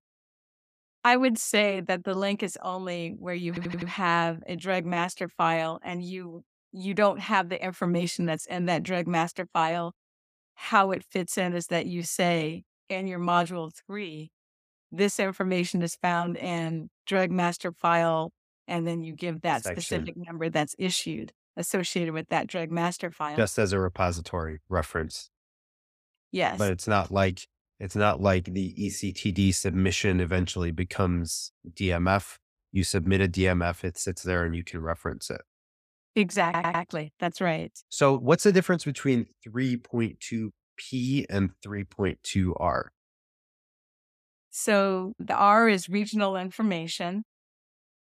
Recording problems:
audio stuttering; at 3.5 s and at 36 s

